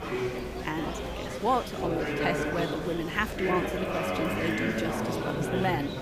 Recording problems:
murmuring crowd; very loud; throughout; 1 dB above the speech

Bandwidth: 15 kHz